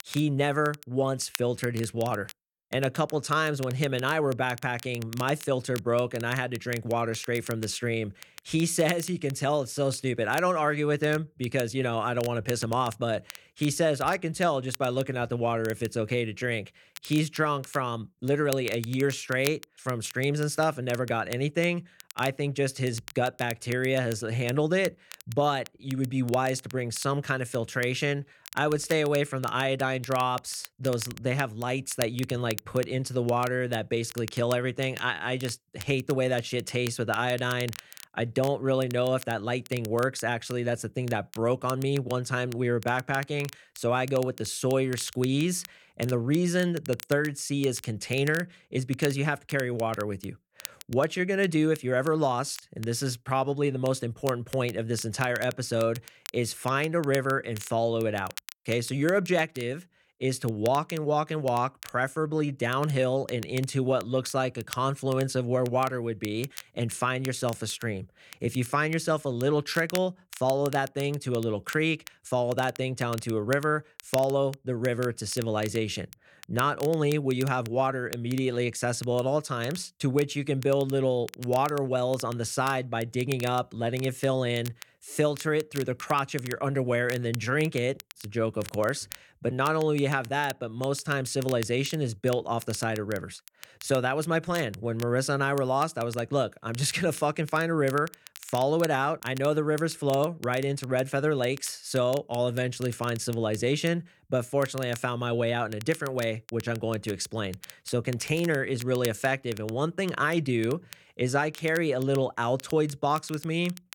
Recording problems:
crackle, like an old record; noticeable; 15 dB below the speech

